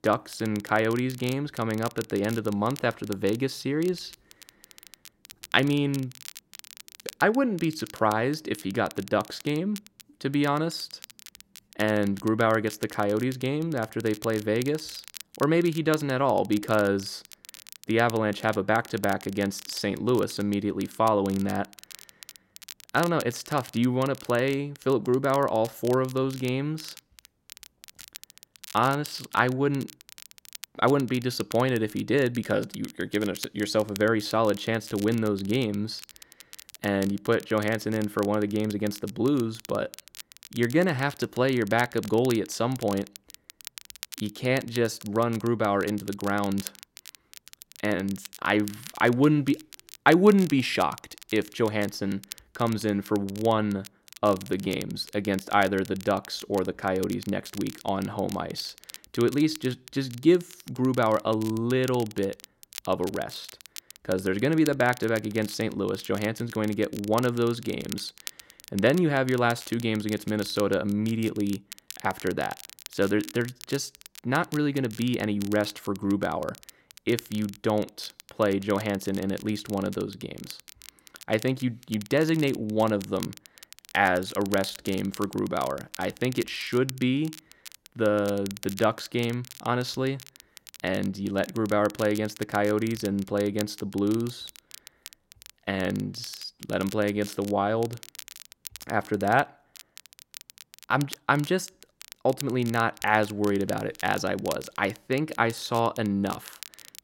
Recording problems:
crackle, like an old record; noticeable; 15 dB below the speech

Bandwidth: 16 kHz